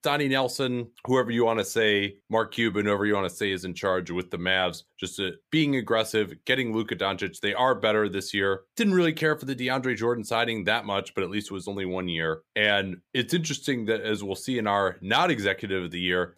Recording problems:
none

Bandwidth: 15 kHz